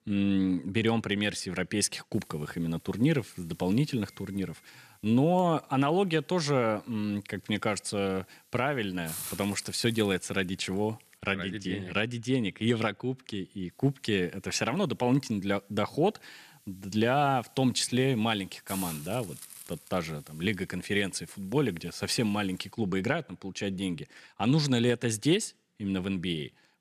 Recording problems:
hiss; noticeable; from 2 to 11 s and from 14 to 23 s; 15 dB below the speech

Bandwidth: 14.5 kHz